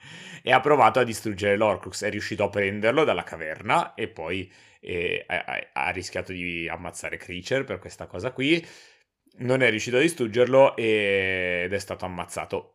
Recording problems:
none

